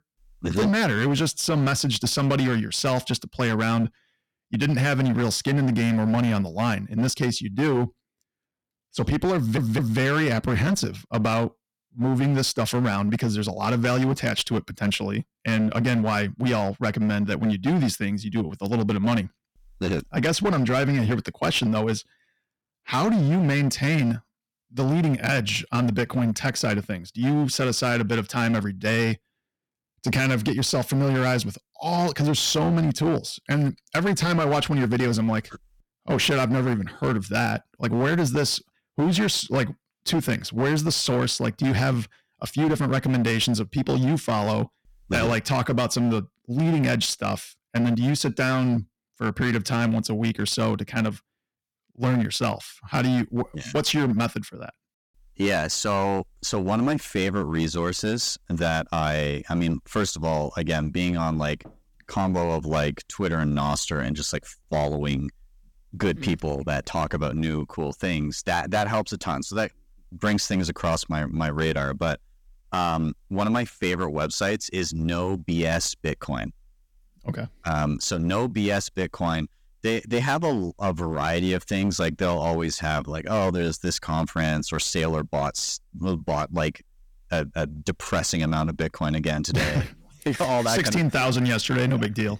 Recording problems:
distortion; slight; 12% of the sound clipped
audio stuttering; at 9.5 s

